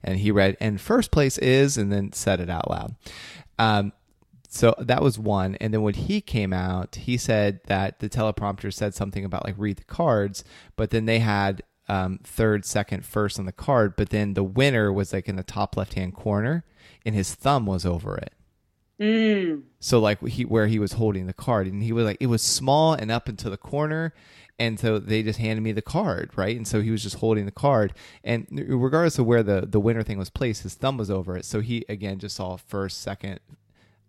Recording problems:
none

